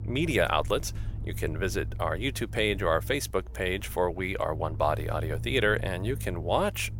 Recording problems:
low rumble; faint; throughout; 20 dB below the speech

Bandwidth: 16.5 kHz